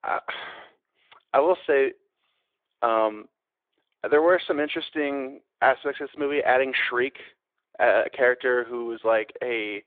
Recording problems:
phone-call audio

